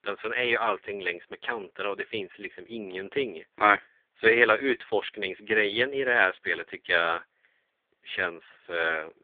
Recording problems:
phone-call audio; poor line; nothing above 3.5 kHz

